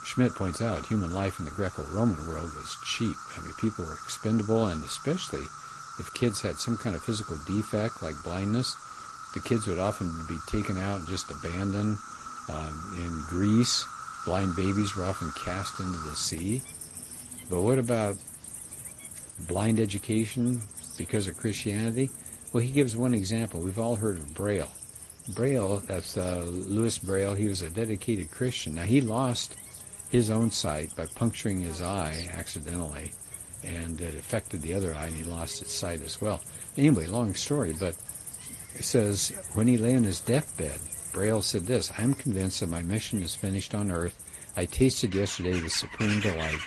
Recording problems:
garbled, watery; slightly; nothing above 10.5 kHz
animal sounds; noticeable; throughout; 10 dB below the speech

